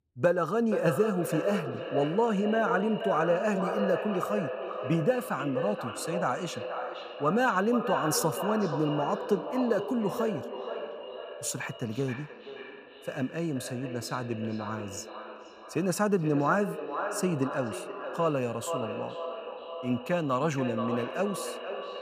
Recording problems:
echo of what is said; strong; throughout; 480 ms later, 6 dB below the speech

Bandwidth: 15 kHz